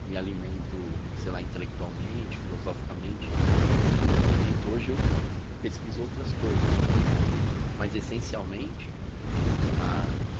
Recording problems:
garbled, watery; slightly; nothing above 7 kHz
wind noise on the microphone; heavy; 2 dB above the speech

